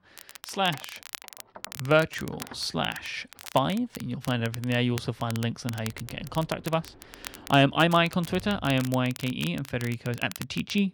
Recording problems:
muffled; slightly; fading above 3.5 kHz
crackle, like an old record; noticeable; 15 dB below the speech
household noises; faint; throughout; 25 dB below the speech
uneven, jittery; strongly; from 1 to 10 s

